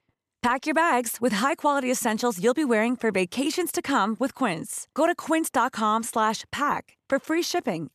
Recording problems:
none

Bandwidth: 14 kHz